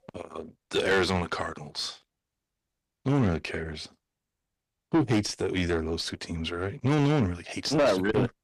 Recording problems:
distortion; heavy; 6 dB below the speech

